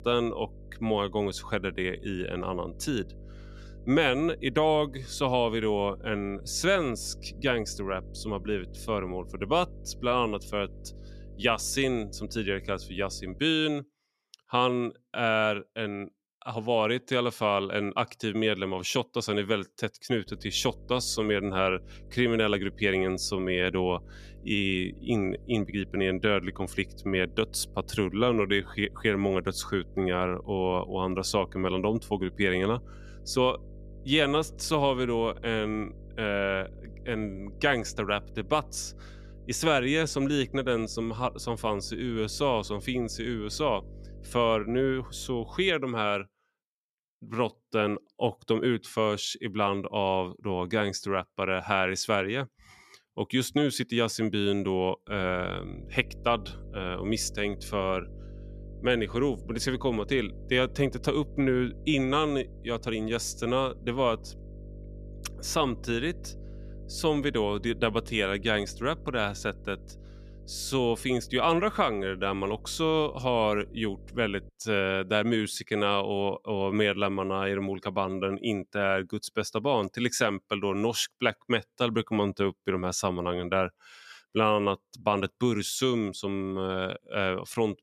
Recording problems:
electrical hum; faint; until 13 s, from 20 to 46 s and from 55 s to 1:14; 50 Hz, 25 dB below the speech

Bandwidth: 14 kHz